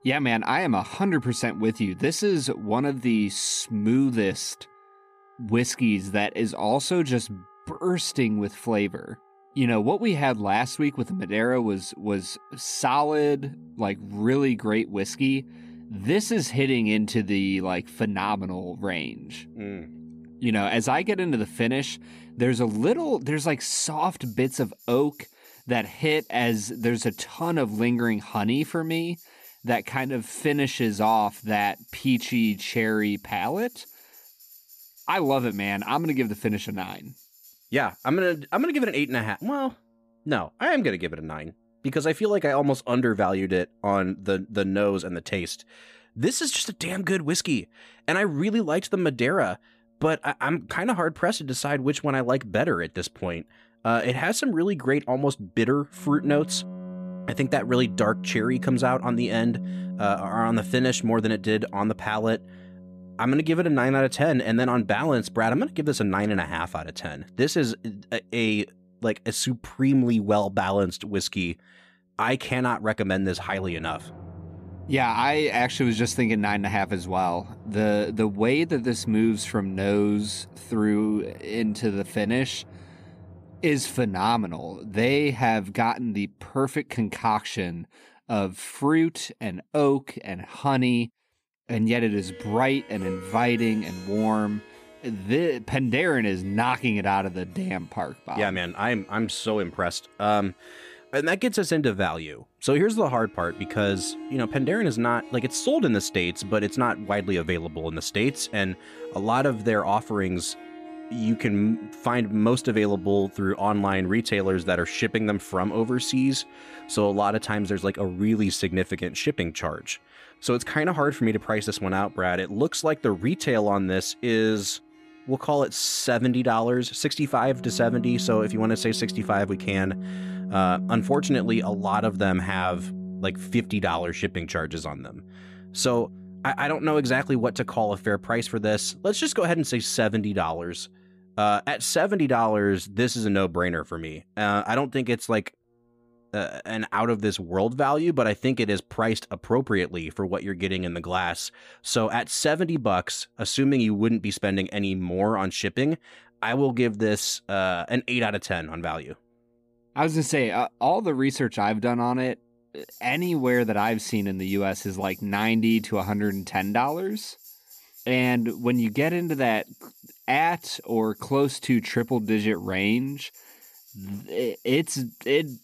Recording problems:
background music; noticeable; throughout; 15 dB below the speech

